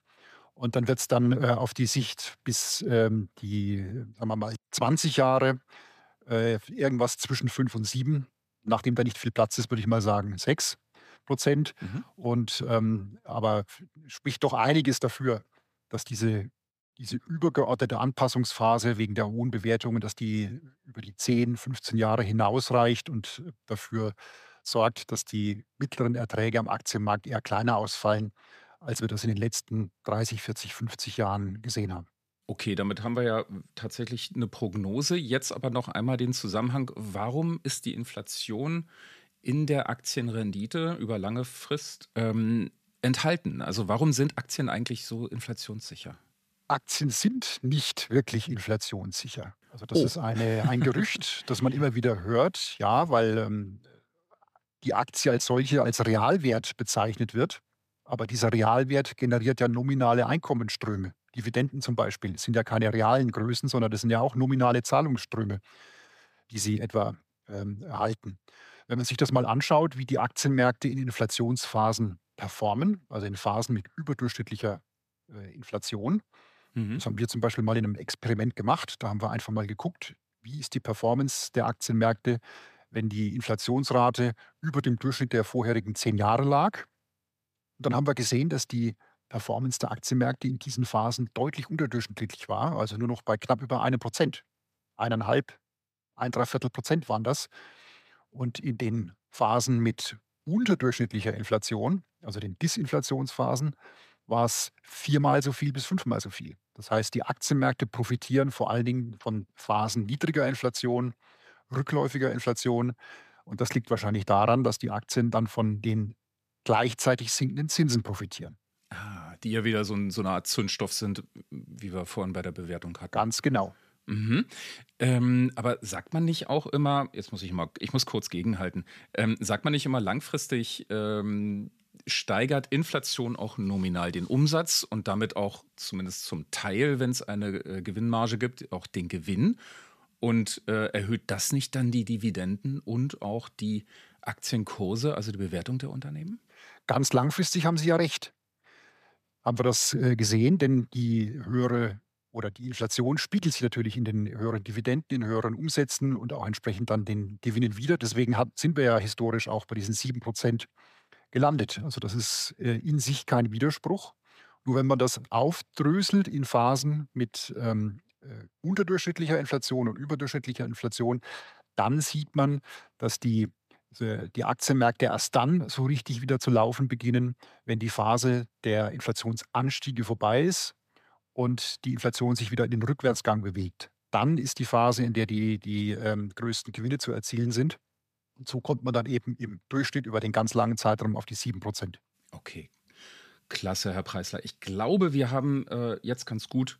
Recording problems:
none

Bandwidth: 14.5 kHz